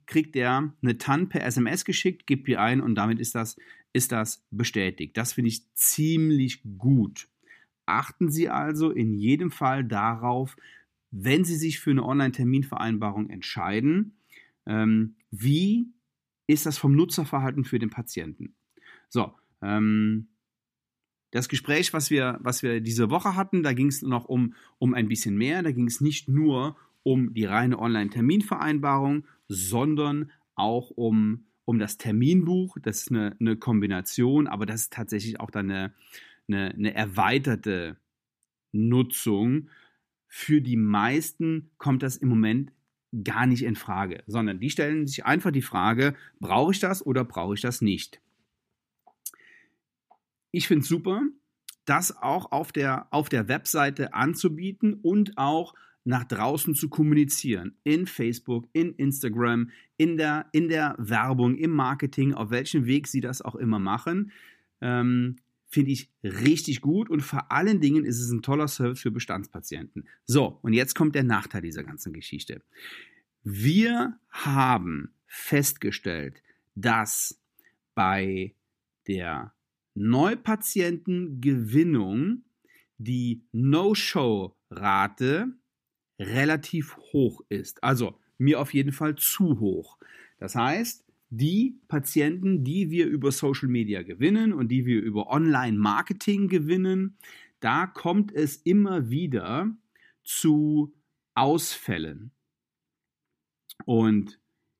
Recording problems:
none

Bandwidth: 14.5 kHz